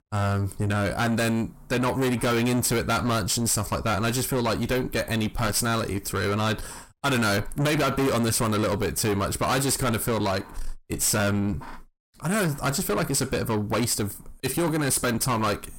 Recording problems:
distortion; heavy; 6 dB below the speech

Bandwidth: 16.5 kHz